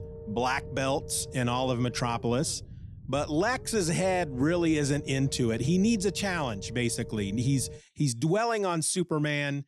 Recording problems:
low rumble; noticeable; until 8 s; 15 dB below the speech

